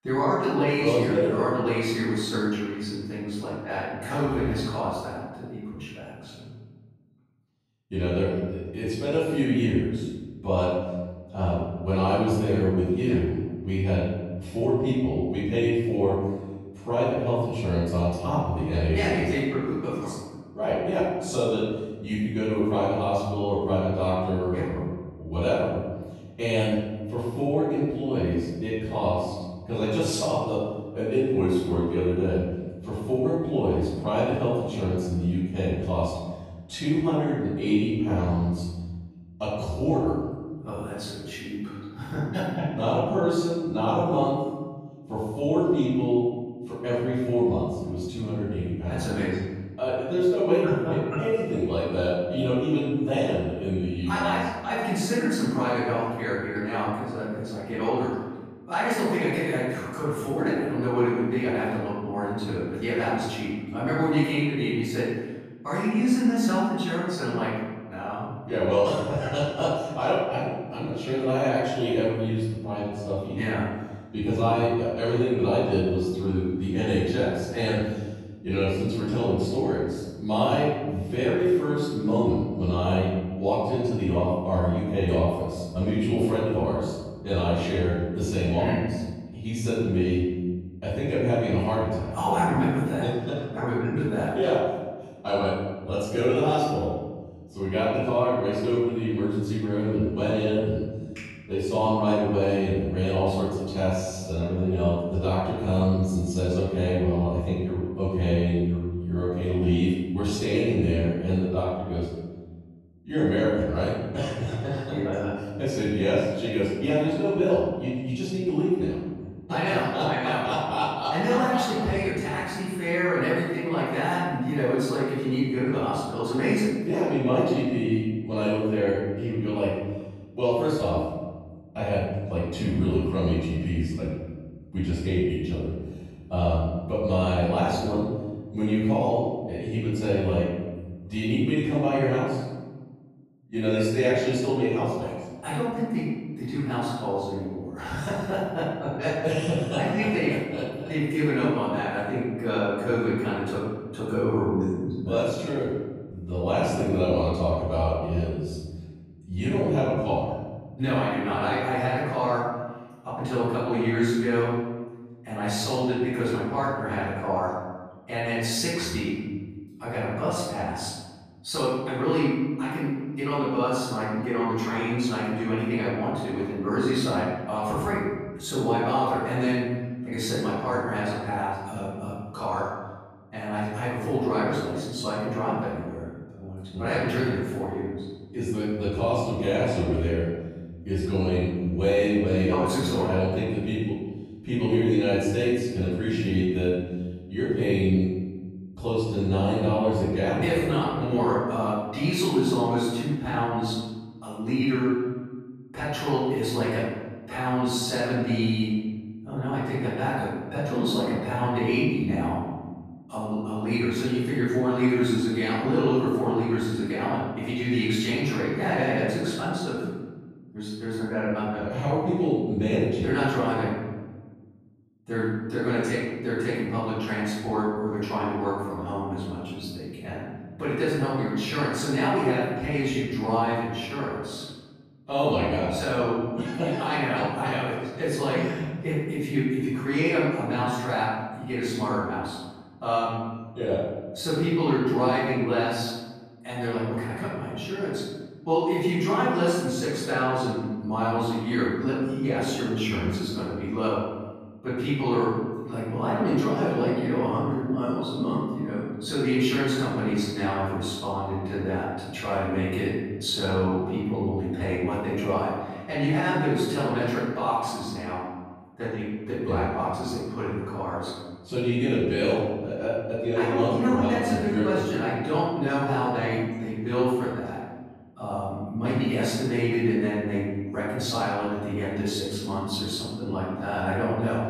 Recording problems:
room echo; strong; dies away in 1.3 s
off-mic speech; far

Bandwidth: 14.5 kHz